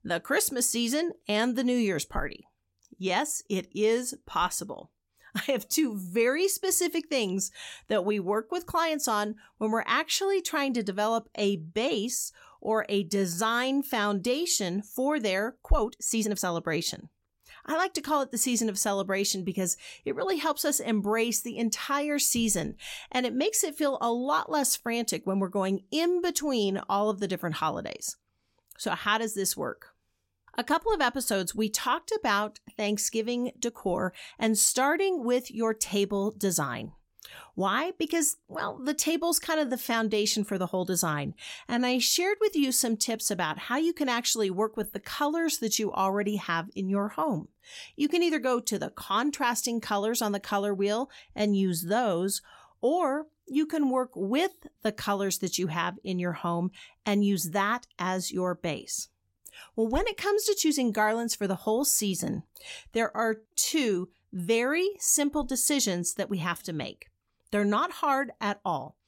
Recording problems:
uneven, jittery; strongly; from 16 s to 1:04

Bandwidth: 16.5 kHz